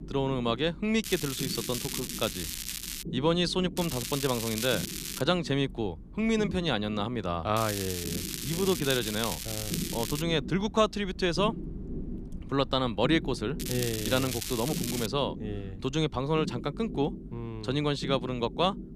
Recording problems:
crackling; loud; 4 times, first at 1 s; 5 dB below the speech
low rumble; noticeable; throughout; 15 dB below the speech

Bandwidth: 14.5 kHz